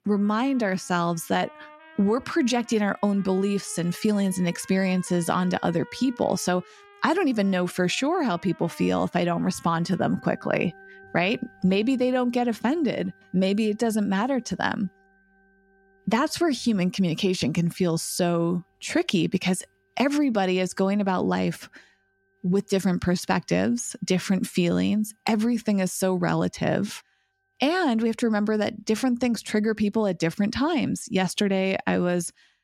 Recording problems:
background music; faint; throughout; 25 dB below the speech

